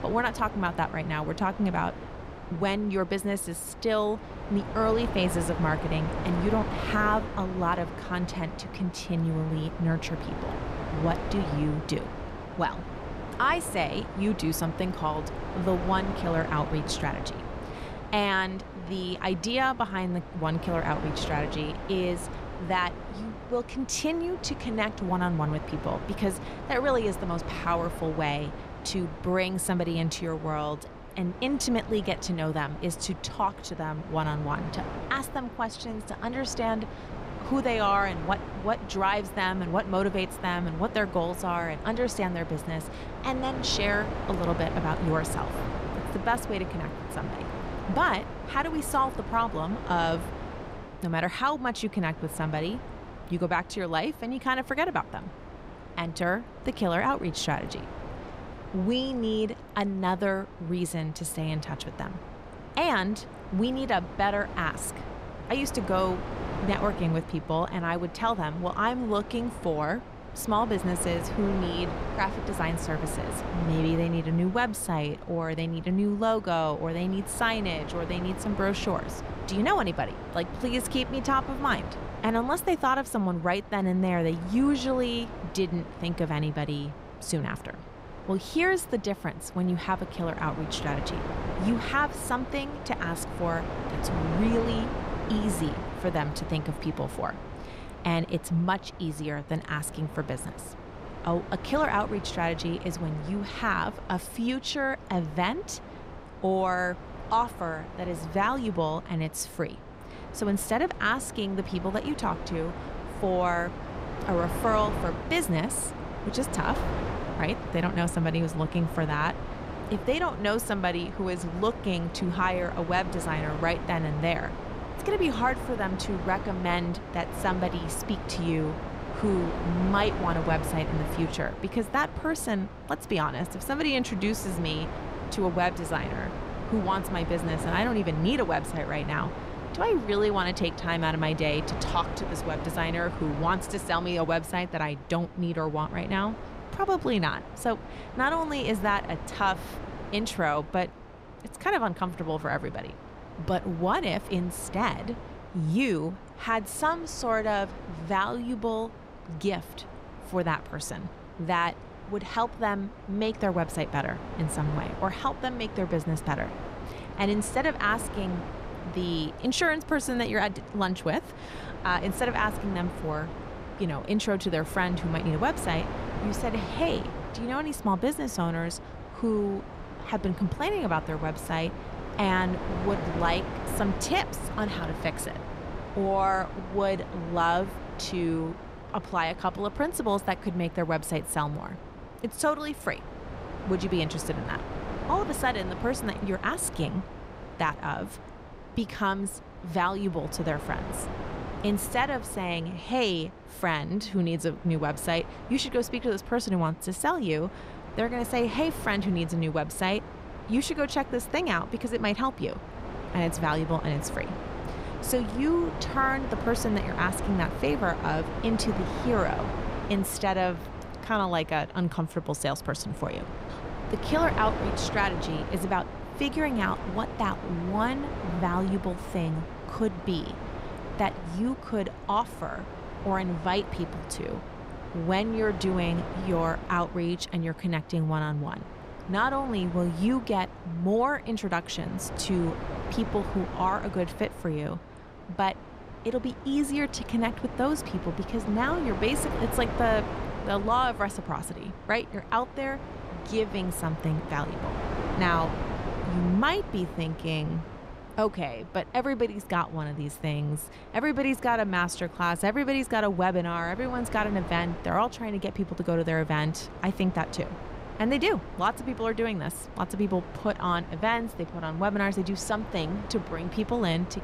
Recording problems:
wind noise on the microphone; occasional gusts; 10 dB below the speech

